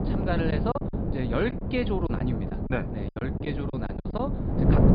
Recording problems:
high frequencies cut off; severe; nothing above 5 kHz
wind noise on the microphone; heavy; 3 dB below the speech
choppy; very; 10% of the speech affected

